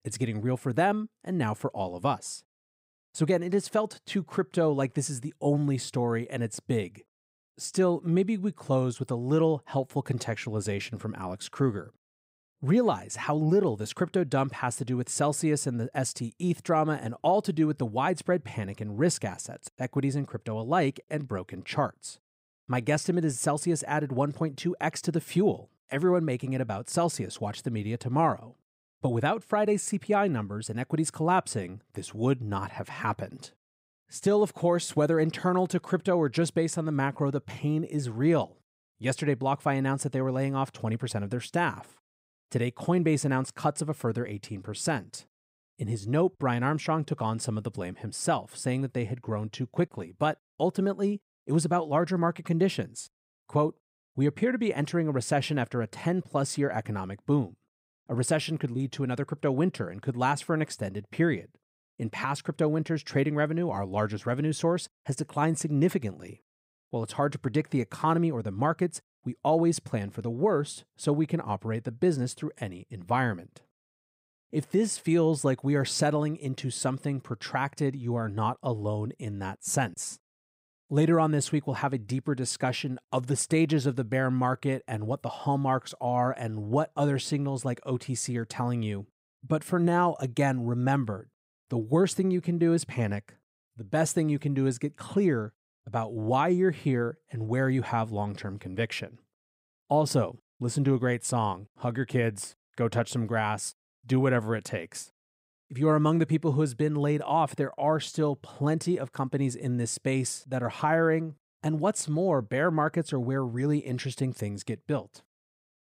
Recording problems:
none

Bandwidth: 15.5 kHz